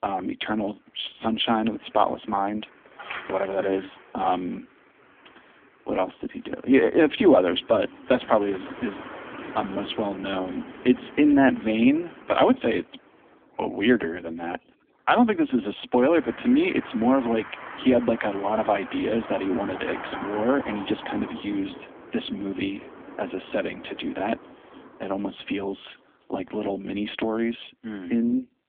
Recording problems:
phone-call audio; poor line; nothing above 3.5 kHz
traffic noise; noticeable; throughout; 15 dB below the speech

